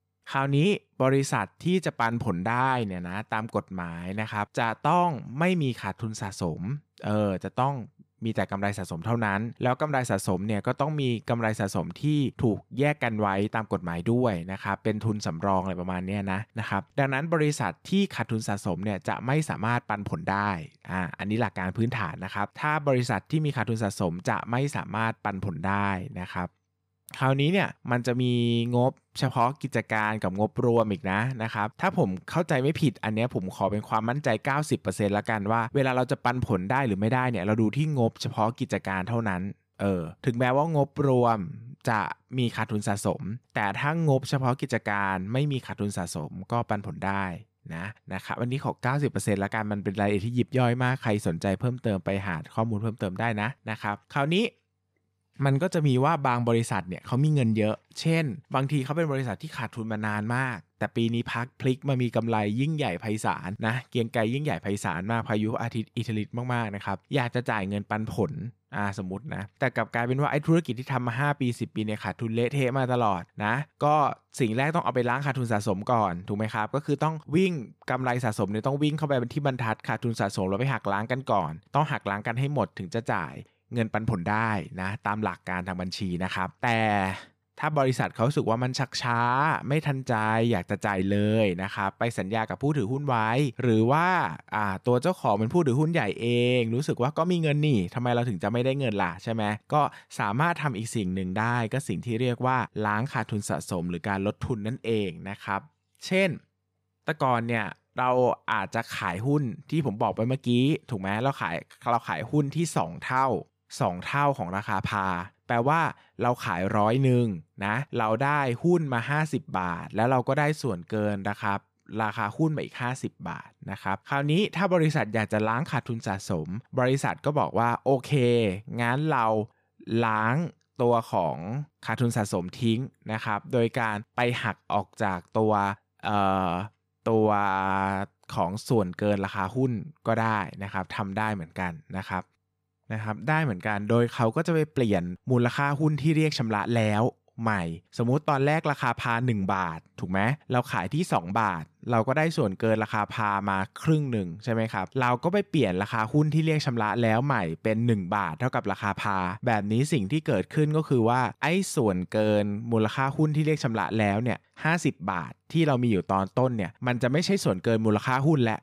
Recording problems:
none

